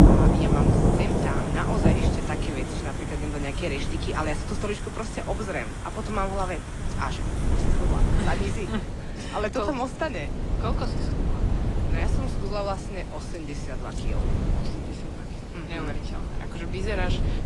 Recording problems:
garbled, watery; slightly; nothing above 10 kHz
rain or running water; very loud; throughout; 4 dB above the speech
wind noise on the microphone; heavy; 8 dB below the speech

